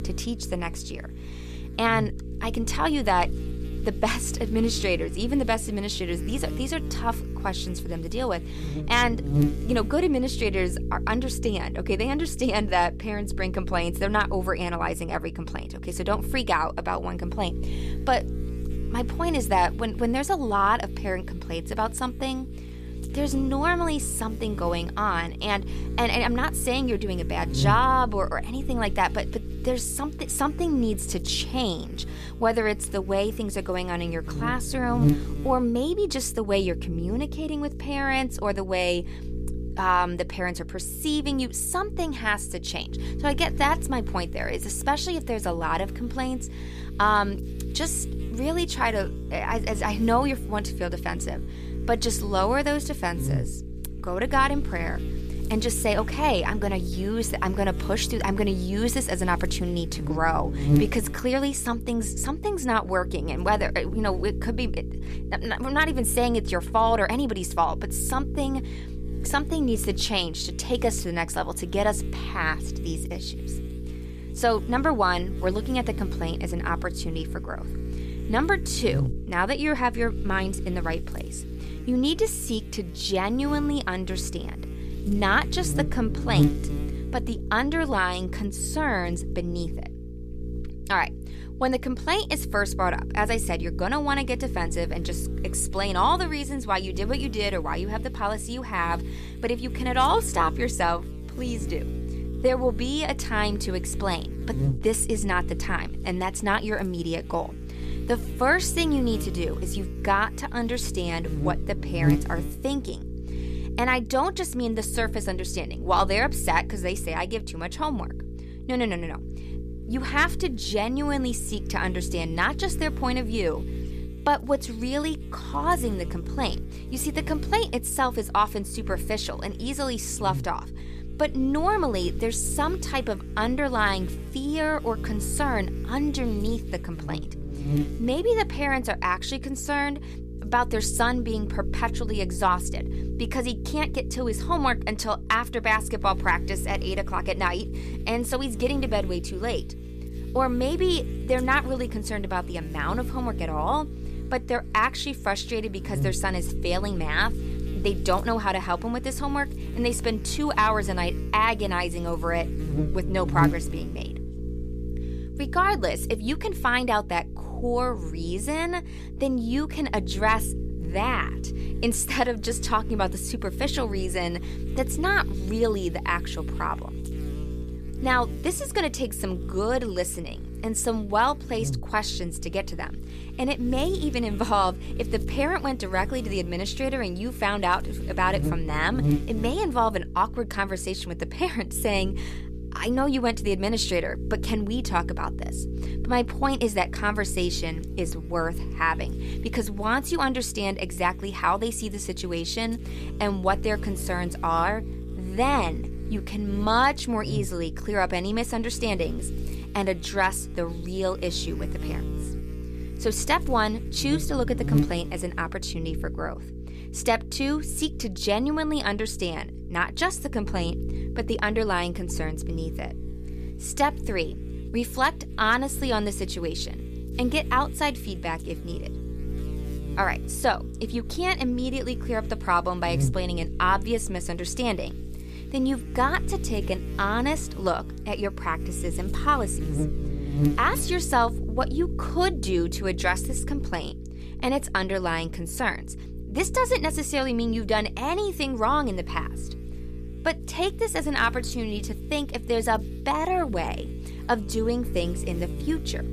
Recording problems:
electrical hum; noticeable; throughout; 60 Hz, 15 dB below the speech

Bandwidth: 14.5 kHz